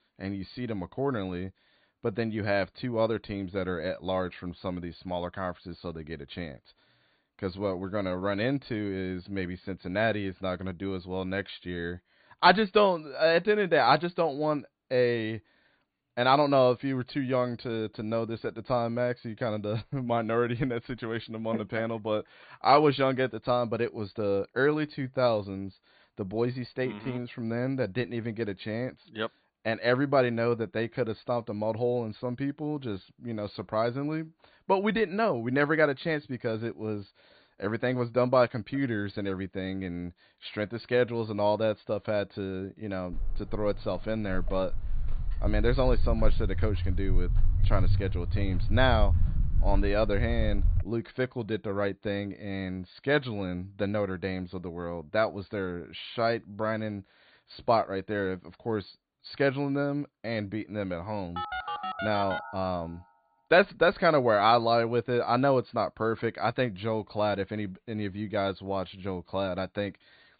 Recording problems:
high frequencies cut off; severe; nothing above 4.5 kHz
footsteps; loud; from 43 to 51 s; peak 2 dB above the speech
phone ringing; noticeable; from 1:01 to 1:03; peak 4 dB below the speech

